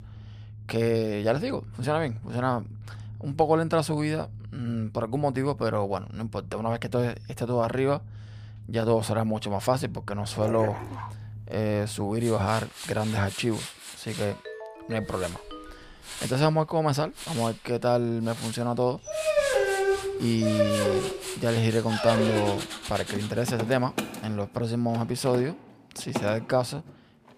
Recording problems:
machinery noise; noticeable; throughout; 10 dB below the speech
dog barking; noticeable; at 10 s; peak 6 dB below the speech
phone ringing; faint; from 14 to 16 s; peak 10 dB below the speech
dog barking; loud; from 19 to 23 s; peak 4 dB above the speech

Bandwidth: 15 kHz